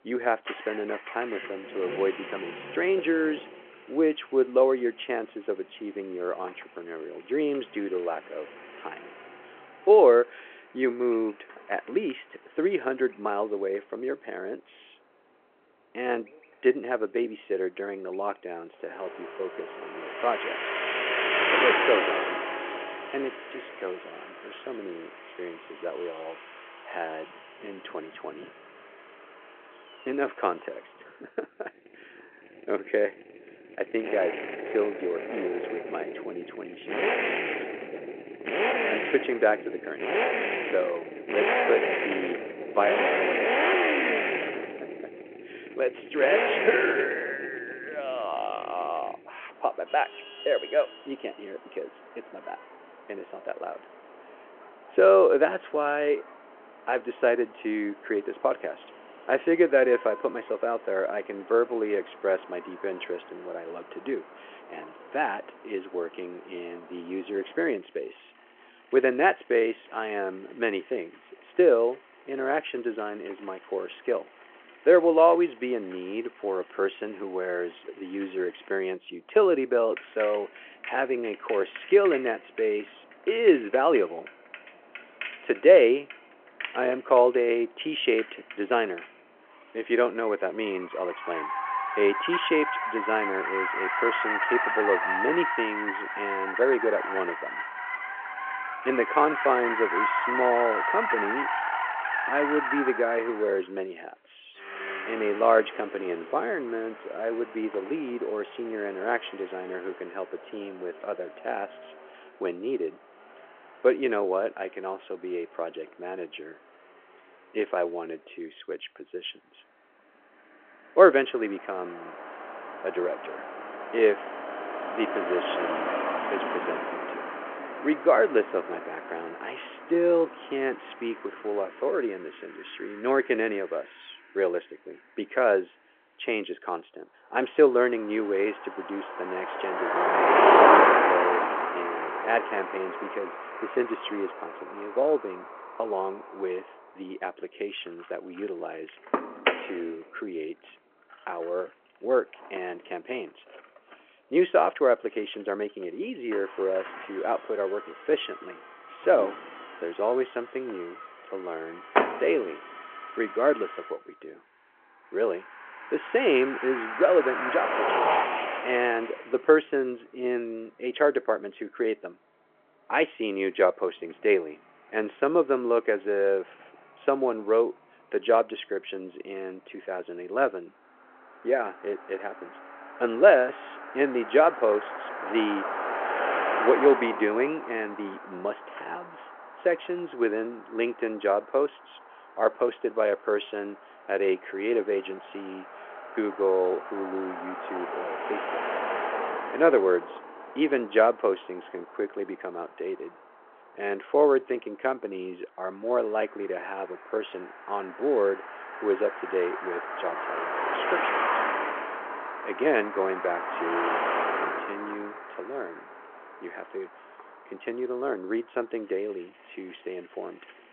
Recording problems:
phone-call audio
traffic noise; loud; throughout; 2 dB below the speech

